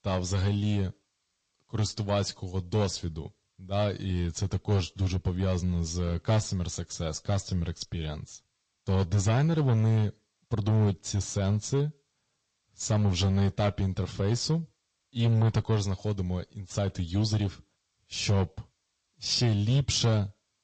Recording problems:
distortion; slight; 6% of the sound clipped
garbled, watery; slightly; nothing above 8 kHz

